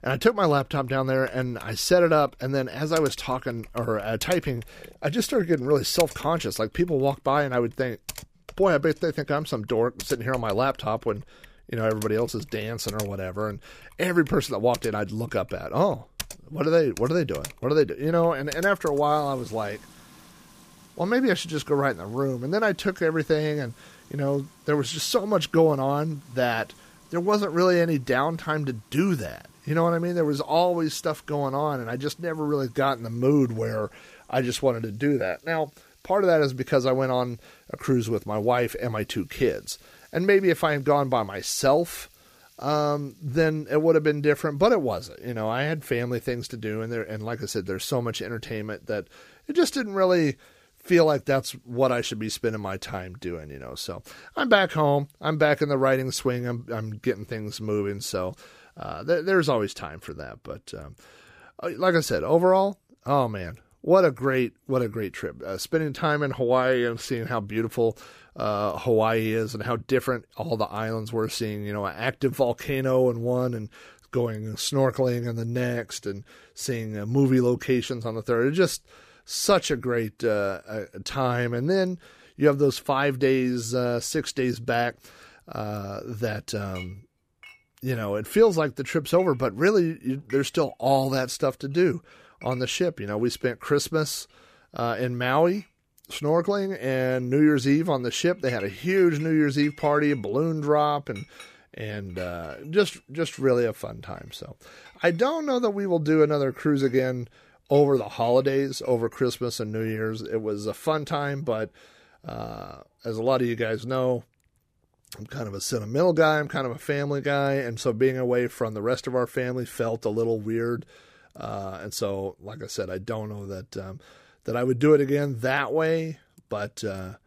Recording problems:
household noises; faint; throughout; 20 dB below the speech

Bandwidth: 15 kHz